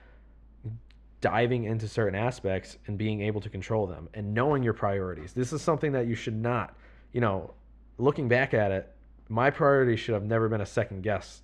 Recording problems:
muffled; very; fading above 2.5 kHz

